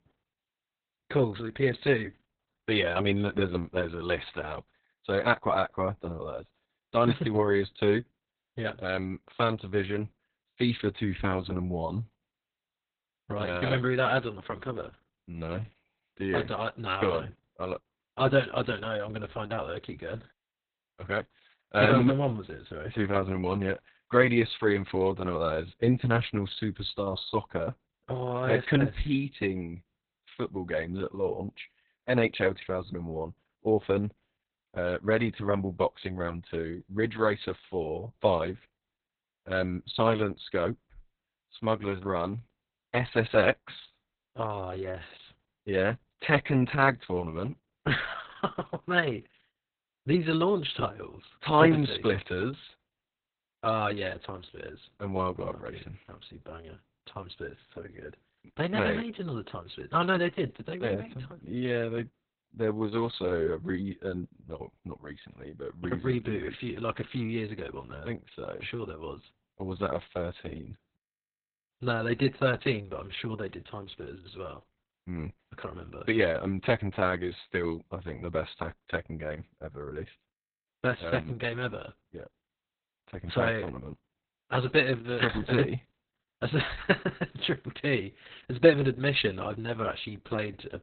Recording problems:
garbled, watery; badly; nothing above 4 kHz

